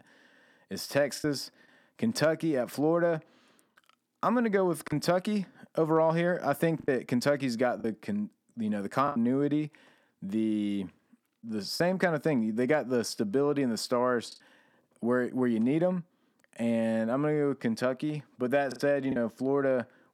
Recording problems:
choppy; occasionally; 3% of the speech affected

